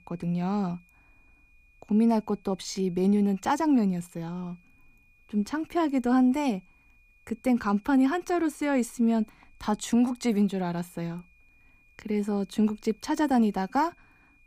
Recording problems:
high-pitched whine; faint; throughout; 2.5 kHz, 35 dB below the speech

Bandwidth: 15 kHz